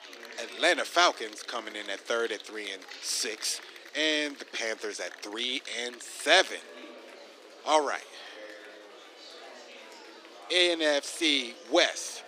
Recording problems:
thin; somewhat; fading below 300 Hz
murmuring crowd; noticeable; throughout; 20 dB below the speech

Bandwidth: 15 kHz